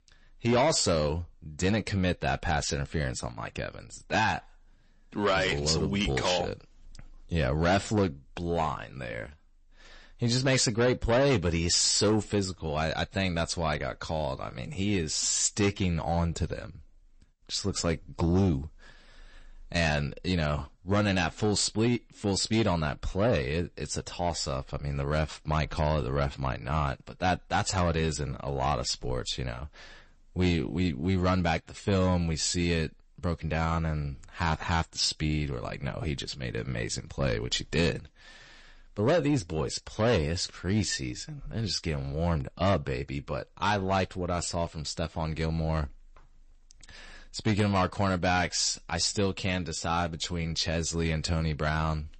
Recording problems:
distortion; slight; 10 dB below the speech
garbled, watery; slightly; nothing above 8 kHz

